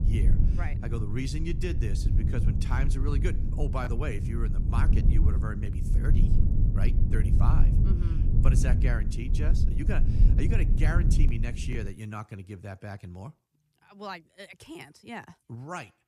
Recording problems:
low rumble; loud; until 12 s; 3 dB below the speech

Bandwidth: 14.5 kHz